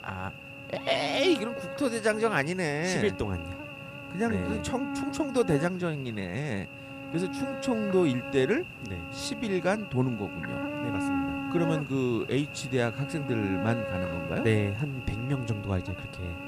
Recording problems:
electrical hum; loud; throughout; 60 Hz, 6 dB below the speech

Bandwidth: 15 kHz